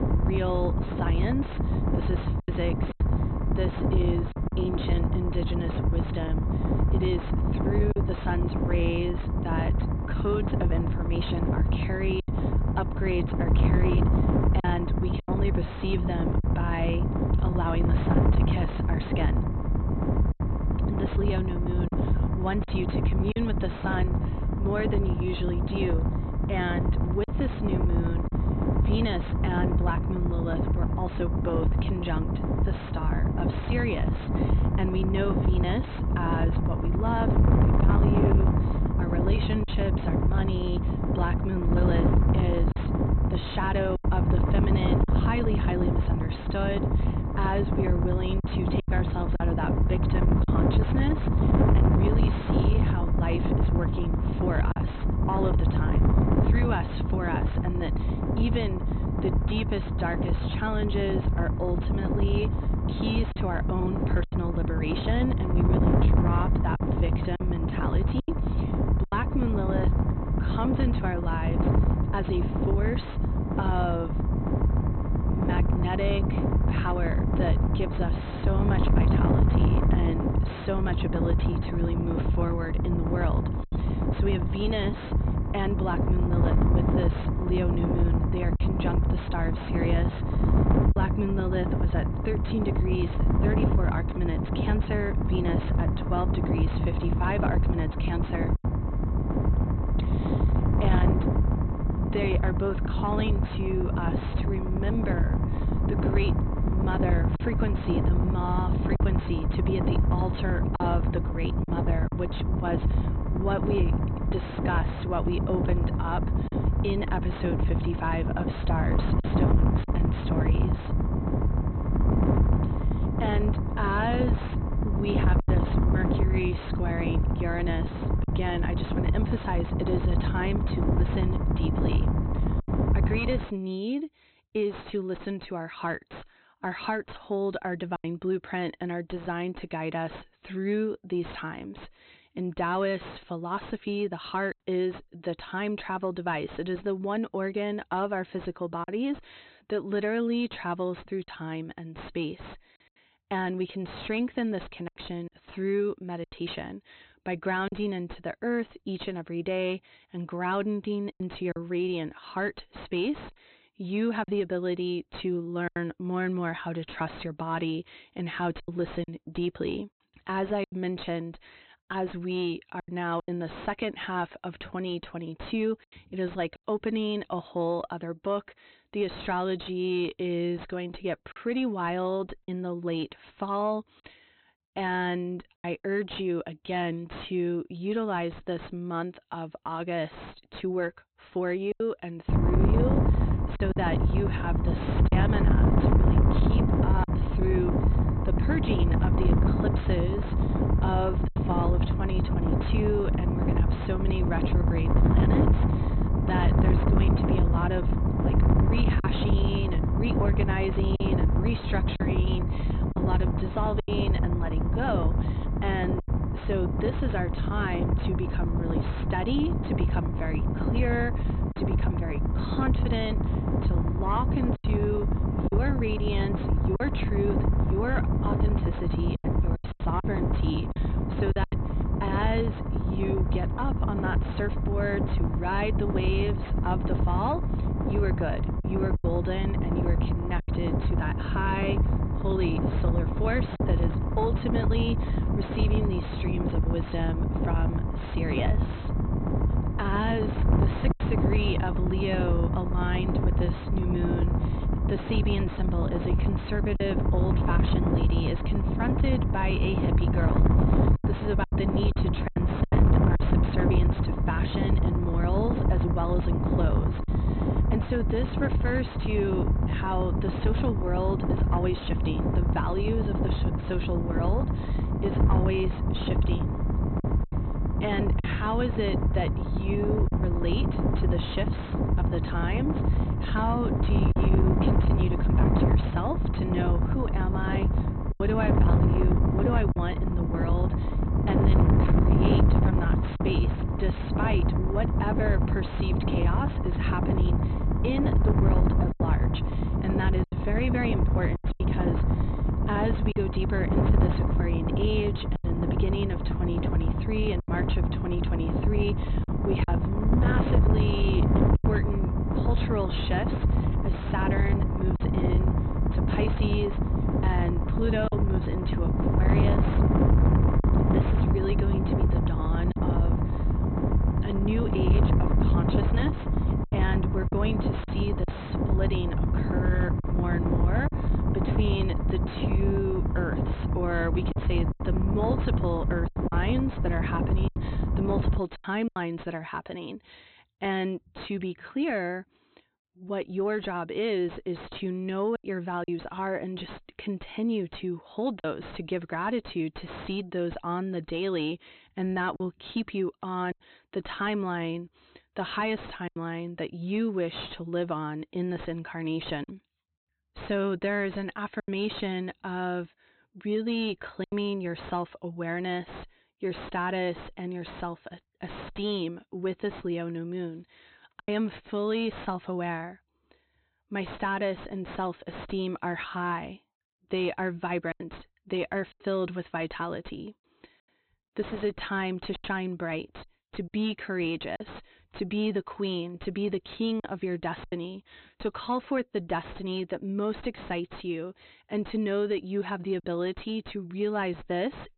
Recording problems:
high frequencies cut off; severe; nothing above 4 kHz
distortion; slight; 10 dB below the speech
wind noise on the microphone; heavy; until 2:13 and from 3:12 to 5:38; 2 dB below the speech
choppy; occasionally; 2% of the speech affected

